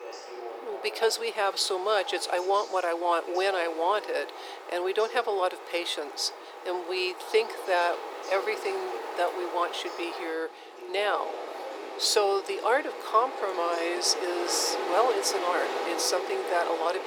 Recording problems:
thin; very; fading below 400 Hz
wind in the background; loud; throughout; 9 dB below the speech
voice in the background; noticeable; throughout; 15 dB below the speech

